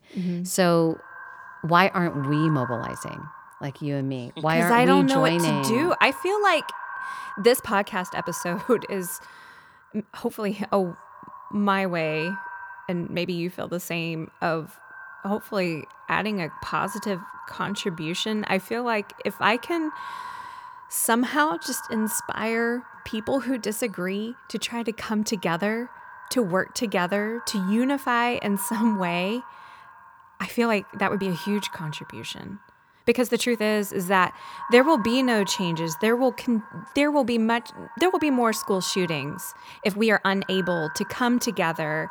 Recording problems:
echo of what is said; noticeable; throughout; 120 ms later, 15 dB below the speech
uneven, jittery; strongly; from 2 to 41 s

